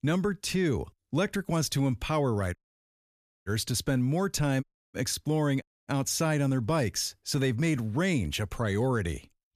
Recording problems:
audio cutting out; at 2.5 s for 1 s, at 4.5 s and at 5.5 s

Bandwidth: 14.5 kHz